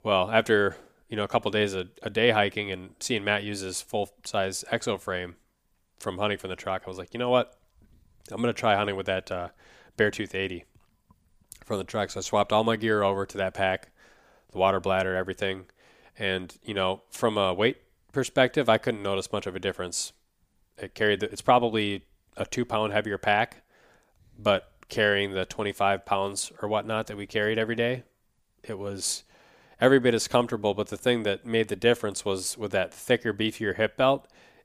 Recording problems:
none

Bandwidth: 15 kHz